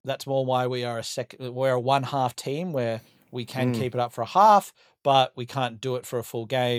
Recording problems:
abrupt cut into speech; at the end

